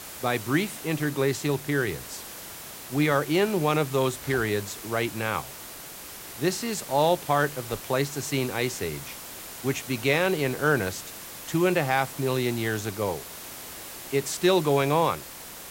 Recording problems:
hiss; noticeable; throughout; 10 dB below the speech

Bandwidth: 16 kHz